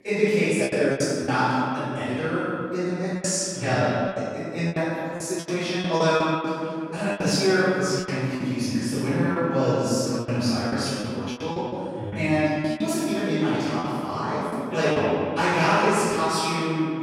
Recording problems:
echo of what is said; strong; throughout; 180 ms later, 10 dB below the speech
room echo; strong; dies away in 2.5 s
off-mic speech; far
background chatter; faint; throughout; 4 voices, 25 dB below the speech
choppy; very; 10% of the speech affected

